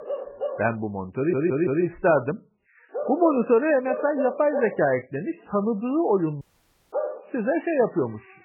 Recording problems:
garbled, watery; badly; nothing above 2.5 kHz
animal sounds; loud; throughout; 8 dB below the speech
audio stuttering; at 1 s
audio cutting out; at 6.5 s for 0.5 s

